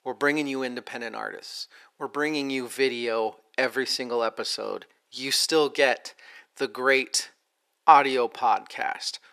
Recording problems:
thin; very; fading below 450 Hz

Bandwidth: 14.5 kHz